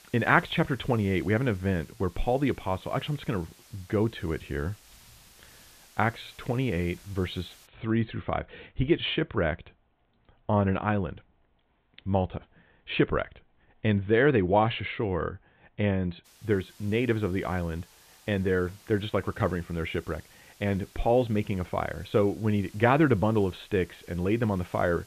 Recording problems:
high frequencies cut off; severe; nothing above 4 kHz
hiss; faint; until 7.5 s and from 16 s on; 25 dB below the speech

